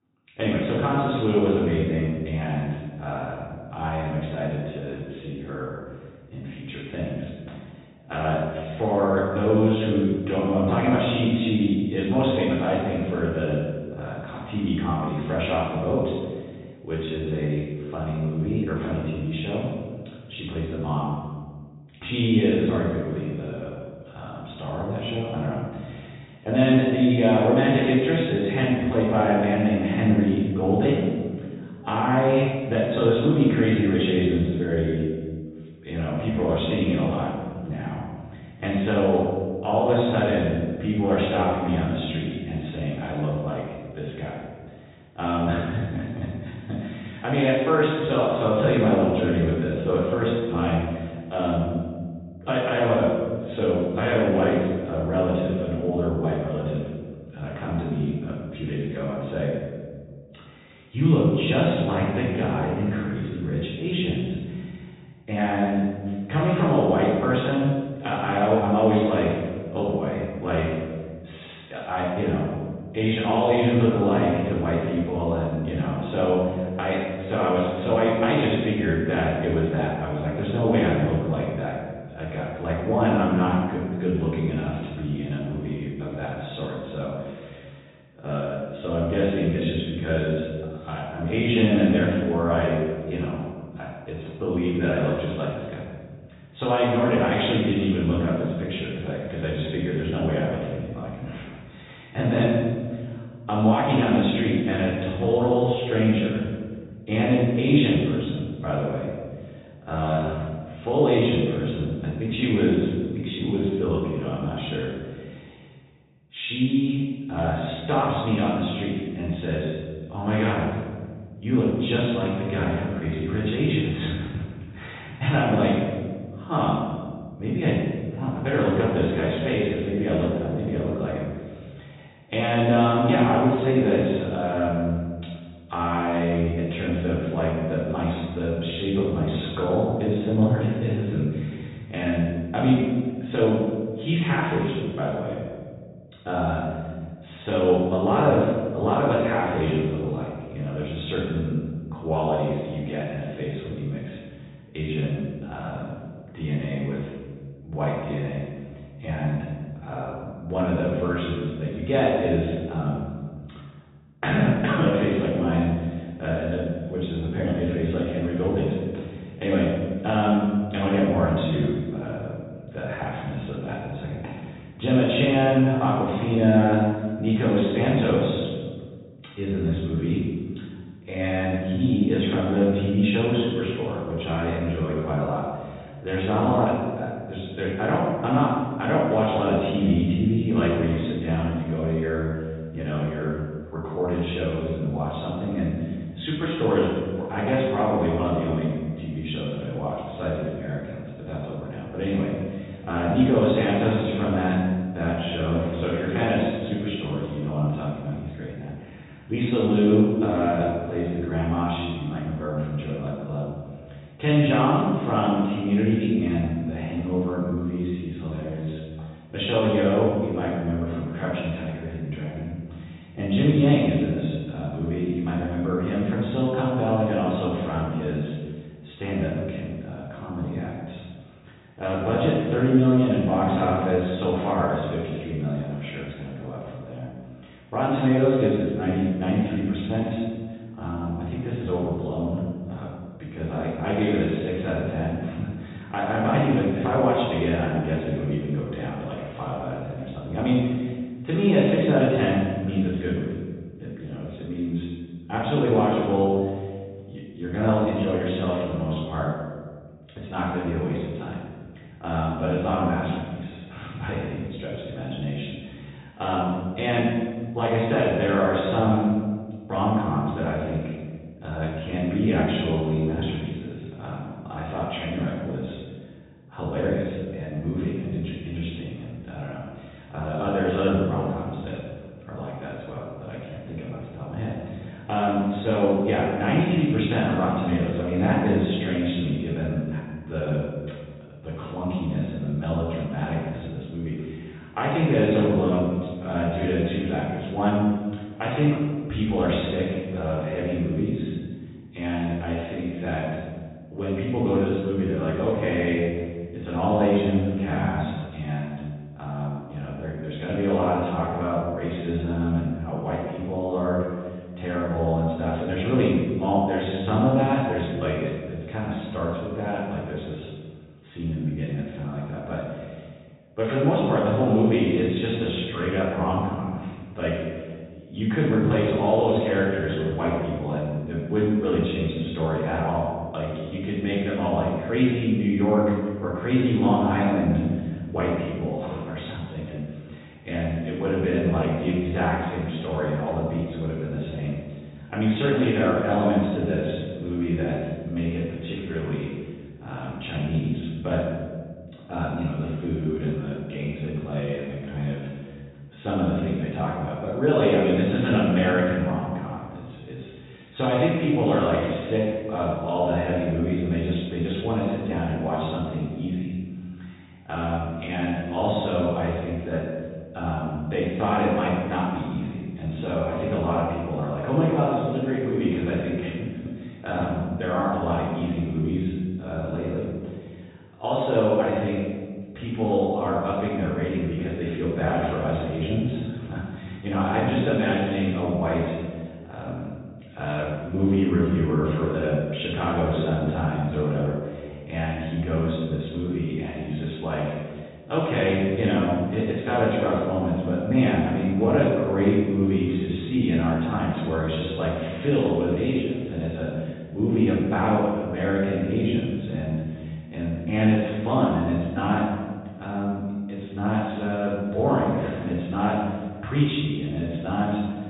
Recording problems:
room echo; strong; dies away in 1.4 s
off-mic speech; far
high frequencies cut off; severe; nothing above 4 kHz

